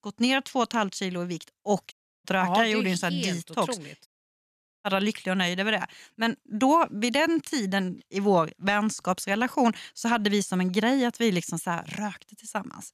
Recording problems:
audio cutting out; at 2 s and at 4 s for 1 s

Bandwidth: 14 kHz